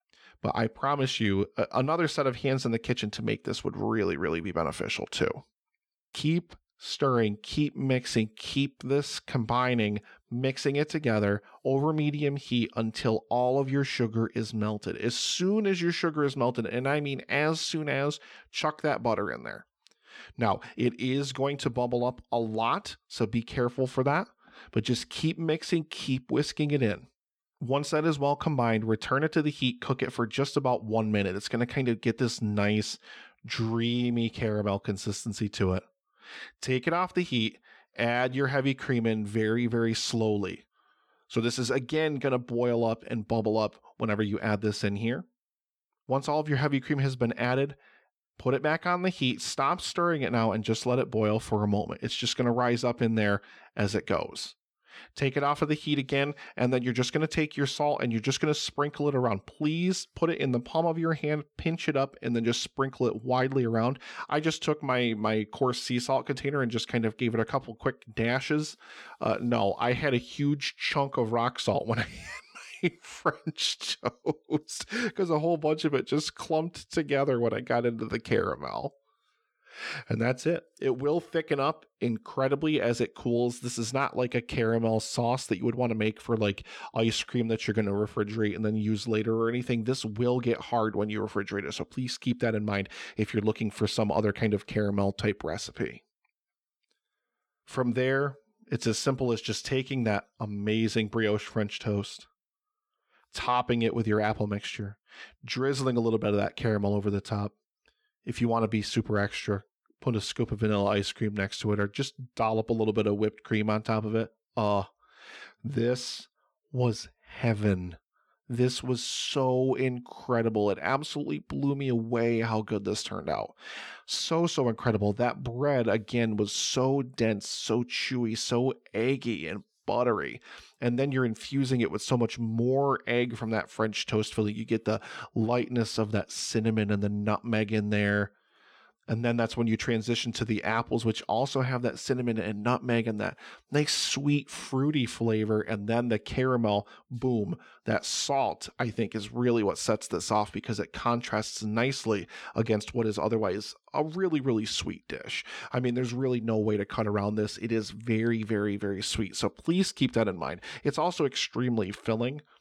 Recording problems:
none

